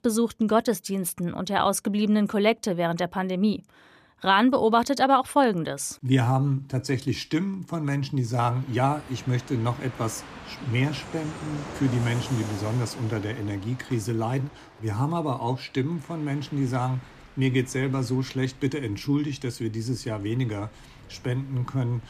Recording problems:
train or aircraft noise; noticeable; from 8.5 s on; 15 dB below the speech

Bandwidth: 14.5 kHz